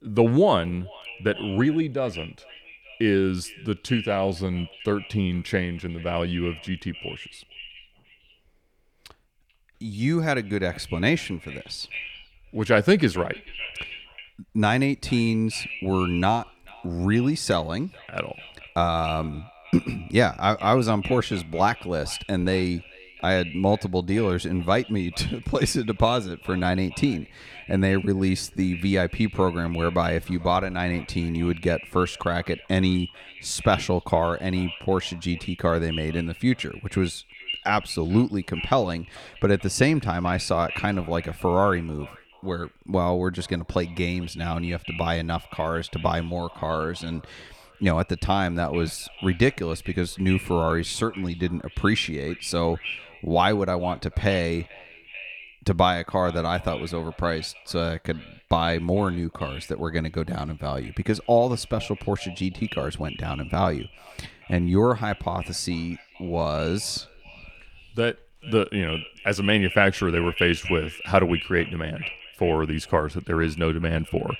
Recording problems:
echo of what is said; noticeable; throughout; 440 ms later, 15 dB below the speech

